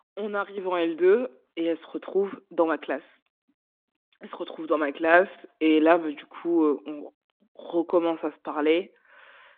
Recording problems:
phone-call audio

